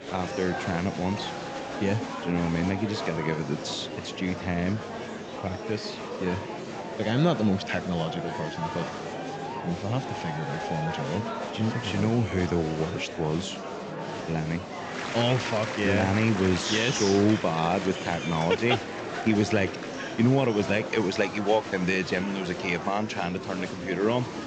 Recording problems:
high frequencies cut off; noticeable; nothing above 8 kHz
murmuring crowd; loud; throughout; 6 dB below the speech

